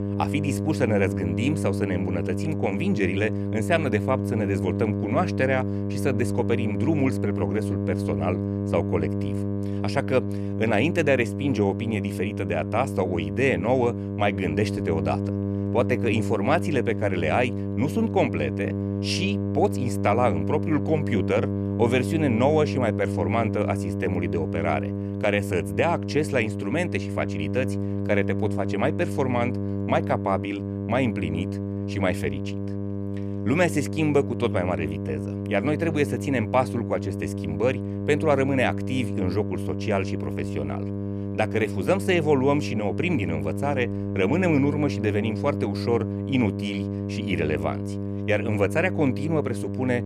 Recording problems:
electrical hum; loud; throughout; 50 Hz, 8 dB below the speech

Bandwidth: 13.5 kHz